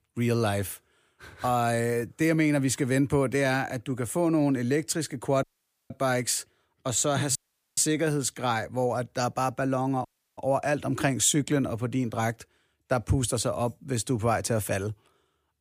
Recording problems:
audio cutting out; at 5.5 s, at 7.5 s and at 10 s

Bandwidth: 15 kHz